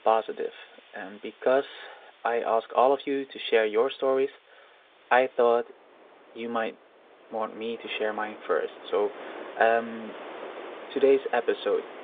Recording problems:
phone-call audio; nothing above 3.5 kHz
wind in the background; noticeable; throughout; 20 dB below the speech

